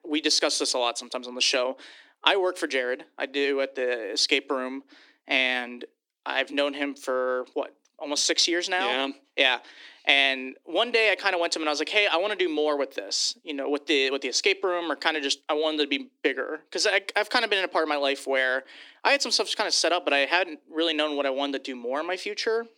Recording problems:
thin; somewhat; fading below 300 Hz

